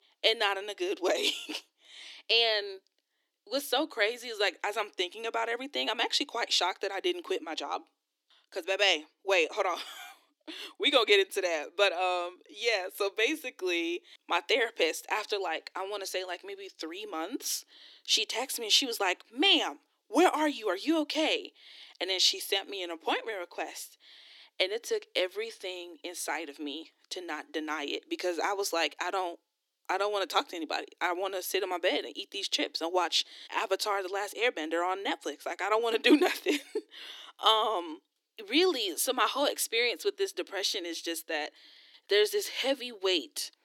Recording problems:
thin; somewhat; fading below 300 Hz

